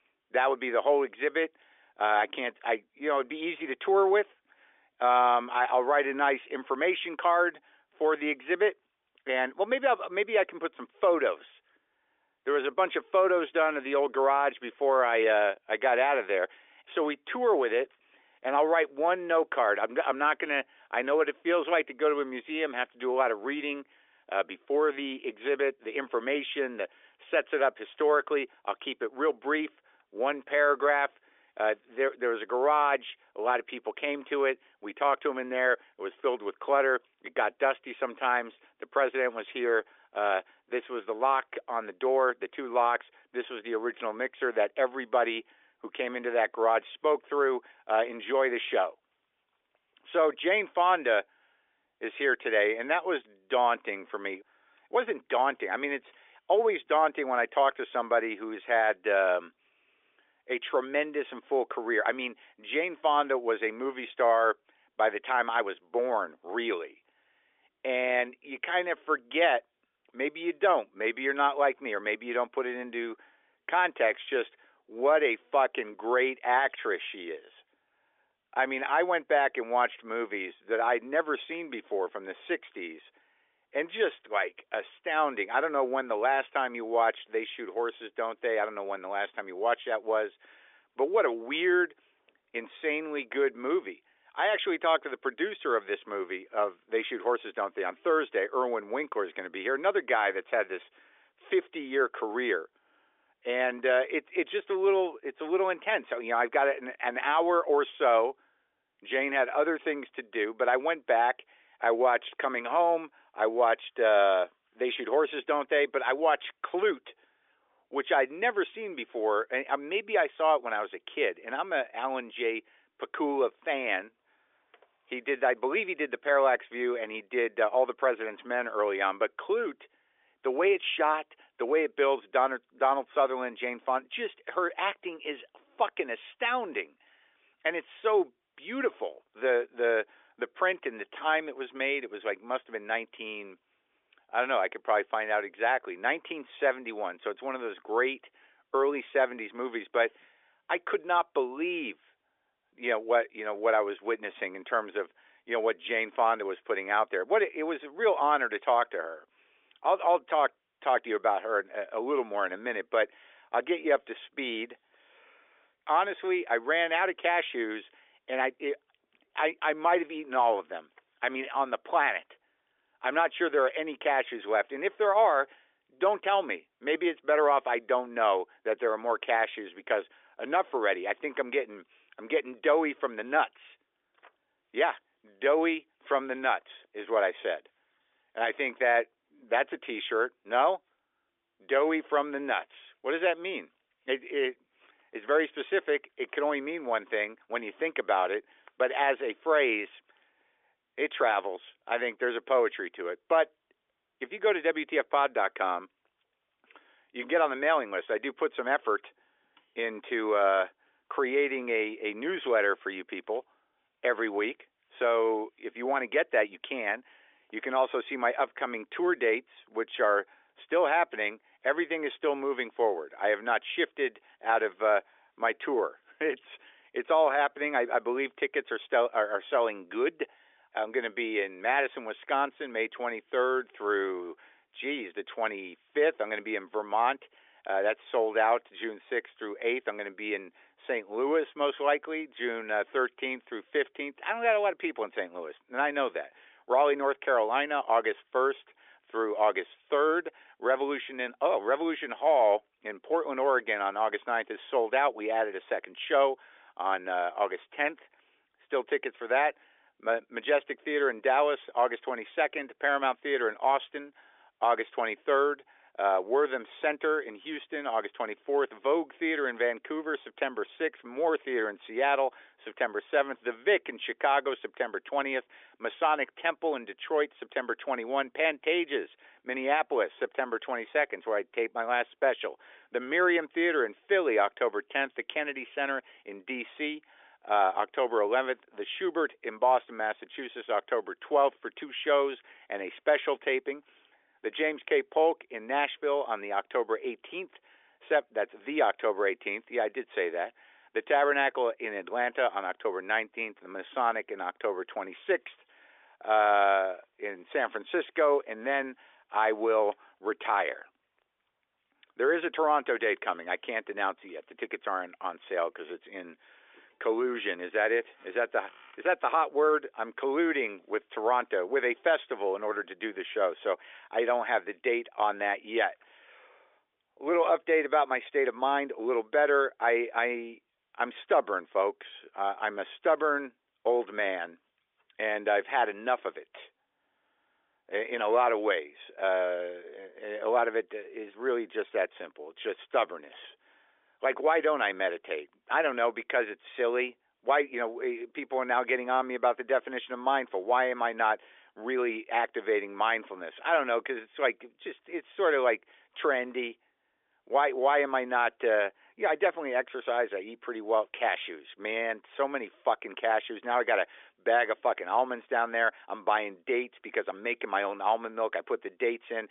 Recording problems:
phone-call audio; nothing above 3.5 kHz

